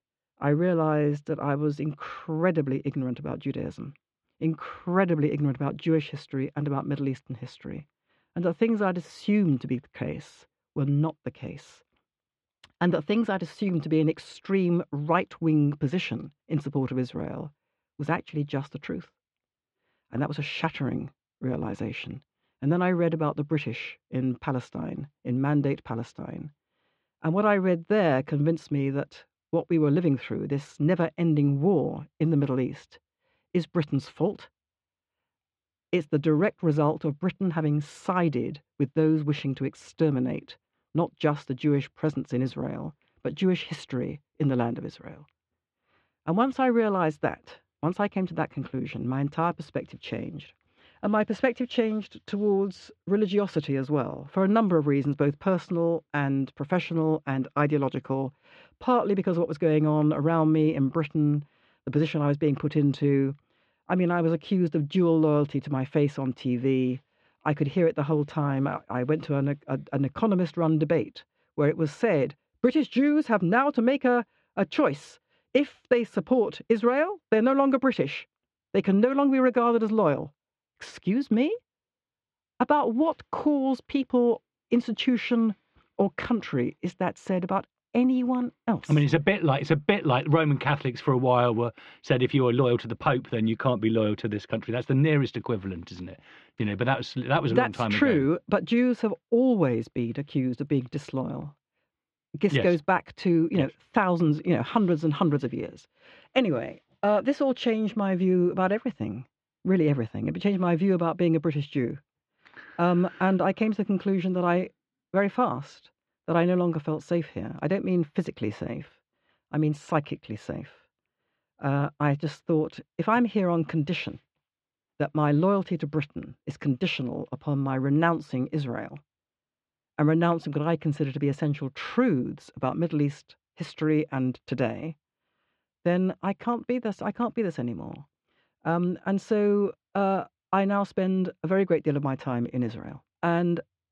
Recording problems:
muffled; very; fading above 3.5 kHz

